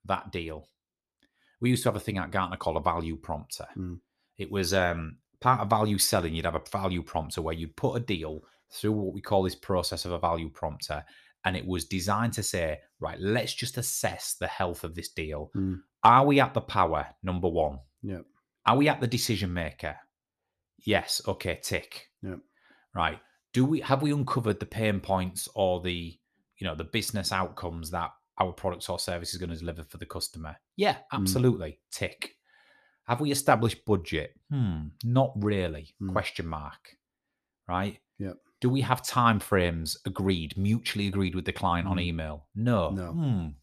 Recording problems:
none

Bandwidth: 14 kHz